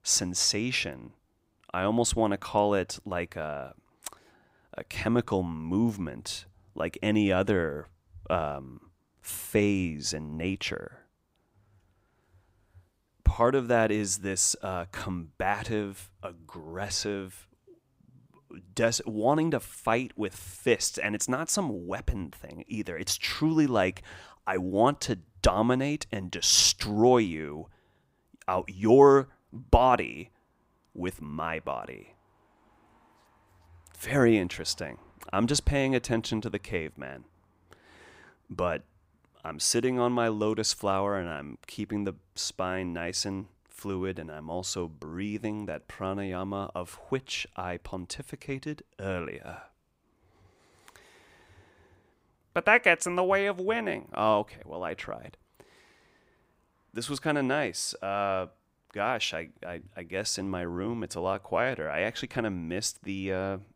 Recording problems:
none

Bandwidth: 15.5 kHz